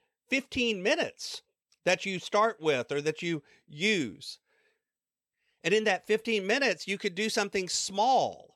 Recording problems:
none

